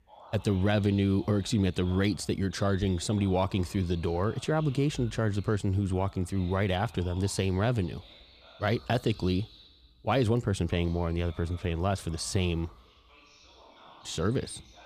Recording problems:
voice in the background; faint; throughout; 25 dB below the speech

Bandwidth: 14.5 kHz